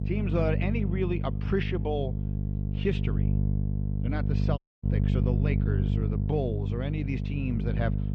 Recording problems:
muffled; very; fading above 3 kHz
electrical hum; loud; throughout; 50 Hz, 5 dB below the speech
audio cutting out; at 4.5 s

